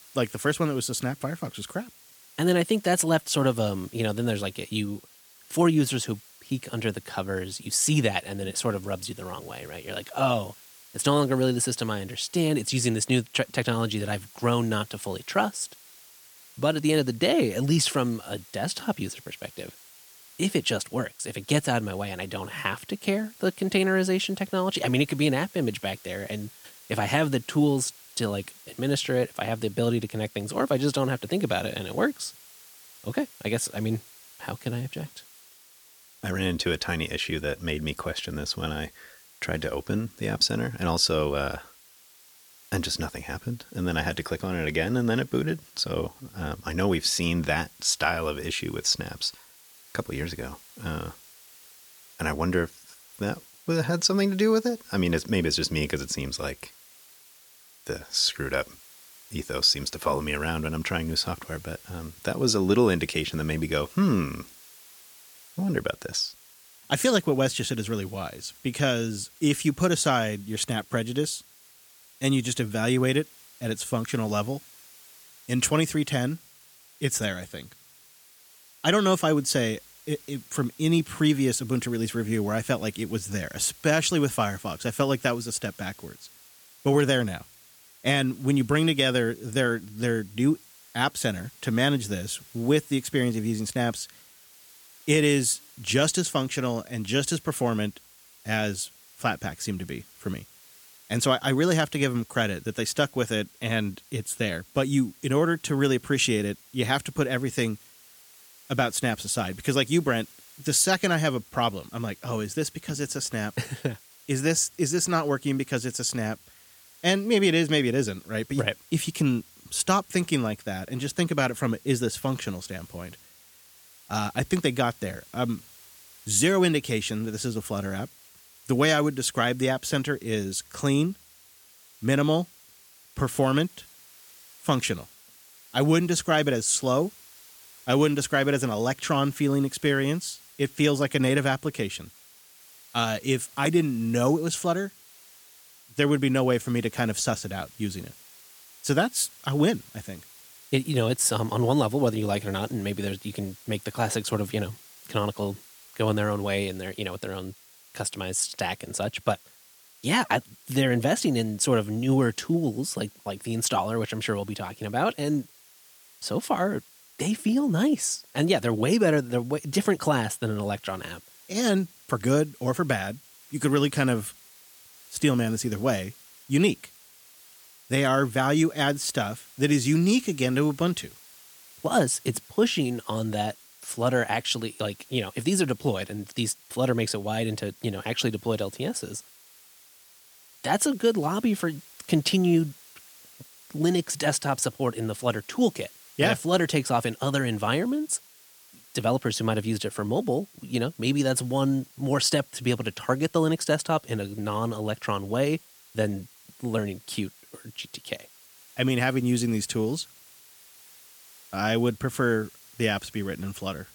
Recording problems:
hiss; faint; throughout; 25 dB below the speech

